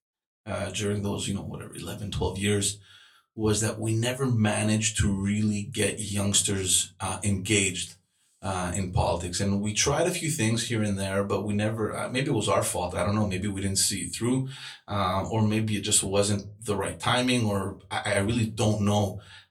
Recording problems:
off-mic speech; far
room echo; very slight; dies away in 0.2 s

